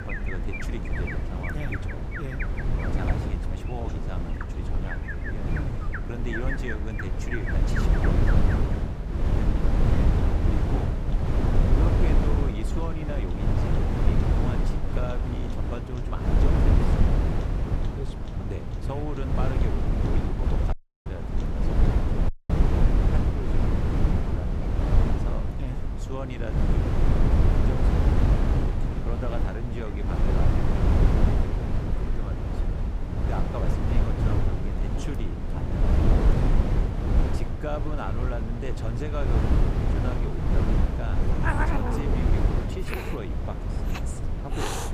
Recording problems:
animal sounds; very loud; throughout; 1 dB above the speech
wind noise on the microphone; heavy; 5 dB above the speech
audio cutting out; at 21 s and at 22 s

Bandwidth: 15 kHz